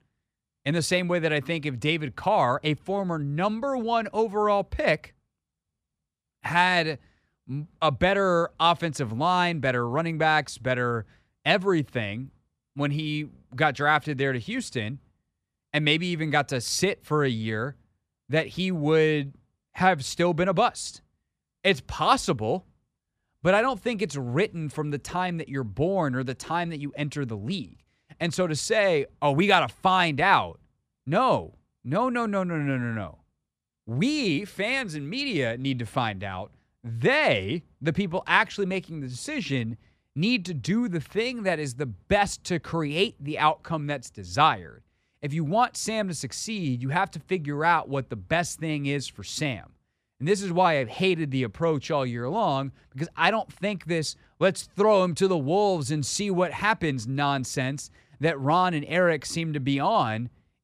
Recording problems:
none

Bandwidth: 14.5 kHz